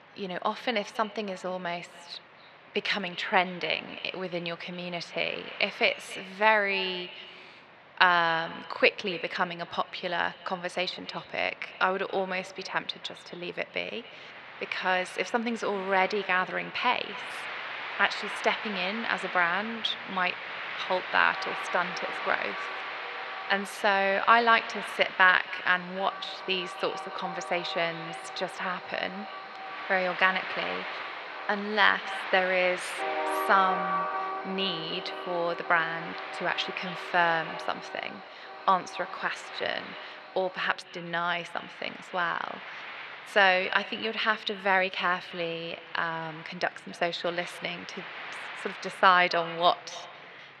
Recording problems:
thin; very; fading below 650 Hz
echo of what is said; noticeable; throughout; 270 ms later, 20 dB below the speech
muffled; slightly; fading above 4 kHz
train or aircraft noise; loud; throughout; 9 dB below the speech

